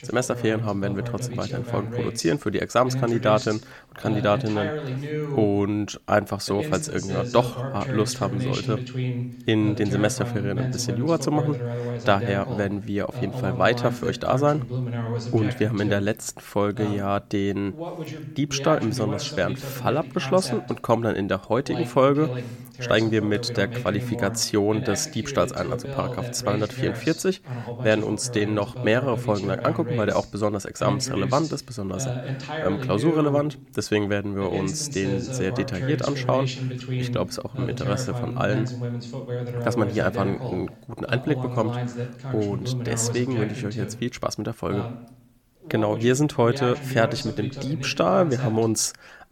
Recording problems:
voice in the background; loud; throughout; 6 dB below the speech

